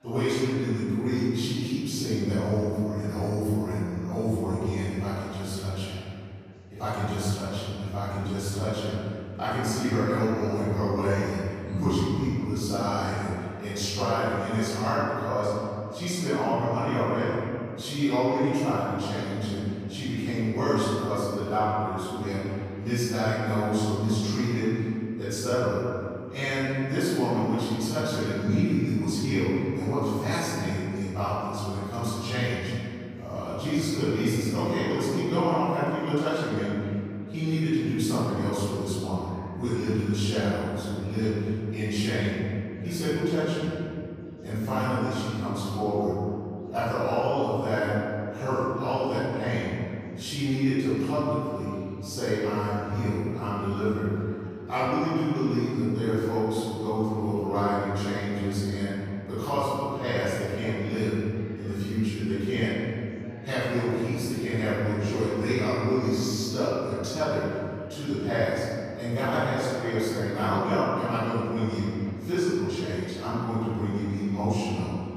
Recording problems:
room echo; strong; dies away in 2.6 s
off-mic speech; far
chatter from many people; faint; throughout; 25 dB below the speech

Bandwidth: 15 kHz